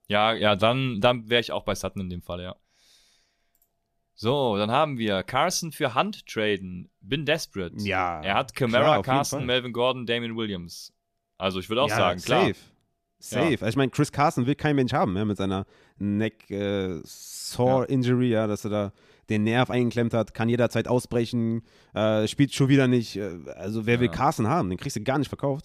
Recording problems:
none

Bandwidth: 14.5 kHz